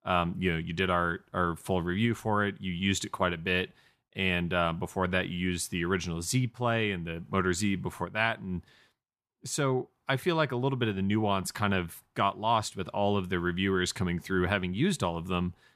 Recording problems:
none

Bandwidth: 14.5 kHz